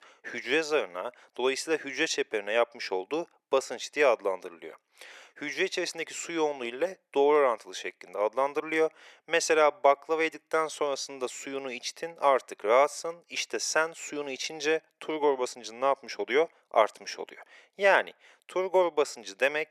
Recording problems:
thin; very; fading below 450 Hz

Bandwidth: 13.5 kHz